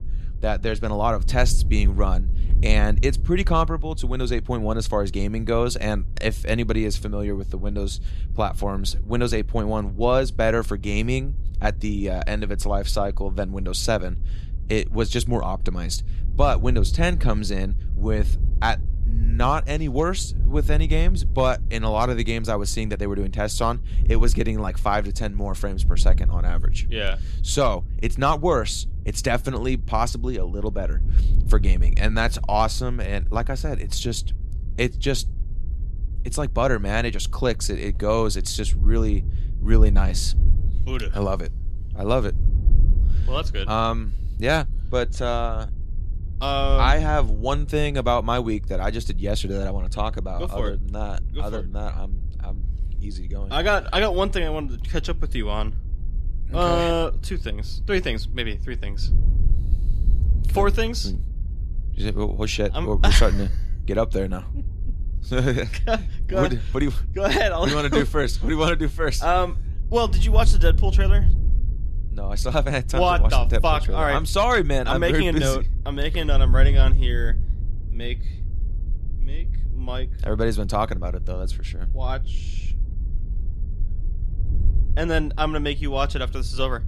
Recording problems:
wind noise on the microphone; occasional gusts; 20 dB below the speech

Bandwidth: 13.5 kHz